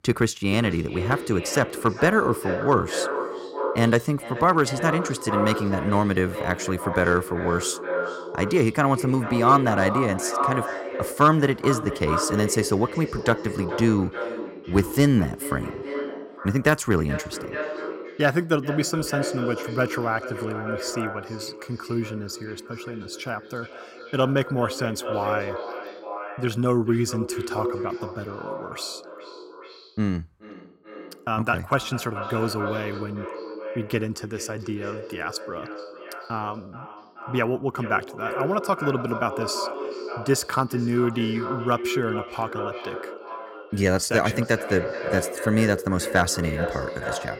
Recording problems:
echo of what is said; strong; throughout; 430 ms later, 7 dB below the speech

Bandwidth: 16 kHz